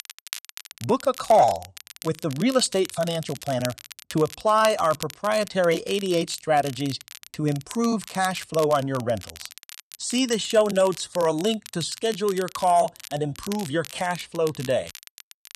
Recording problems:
crackle, like an old record; noticeable; 15 dB below the speech

